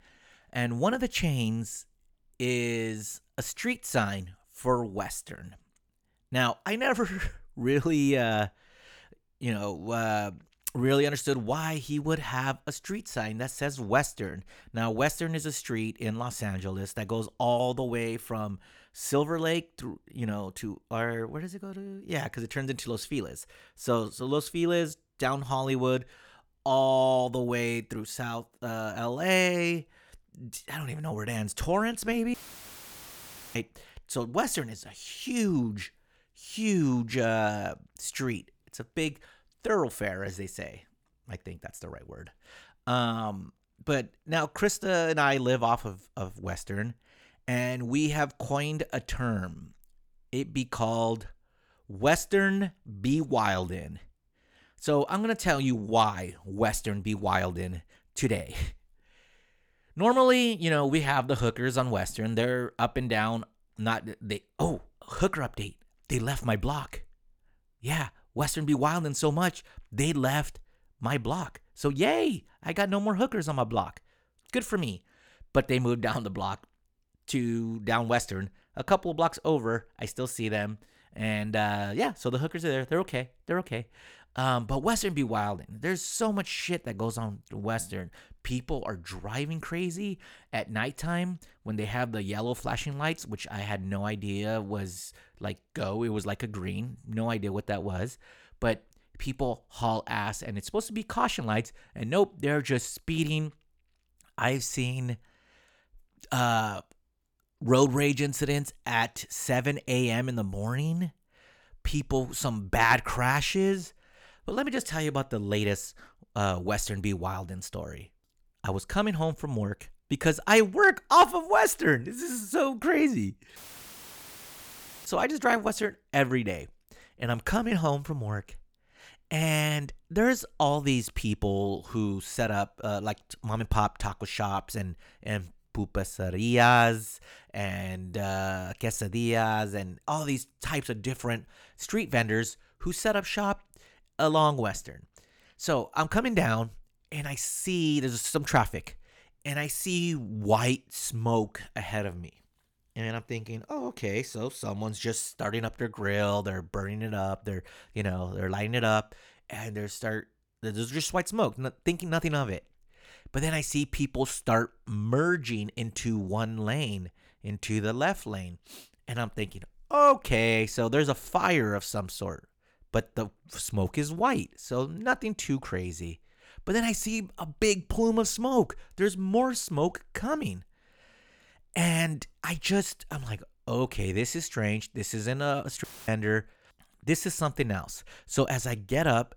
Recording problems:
audio cutting out; filled with static; at 32 s for 1 s, at 2:04 for 1.5 s and at 3:06

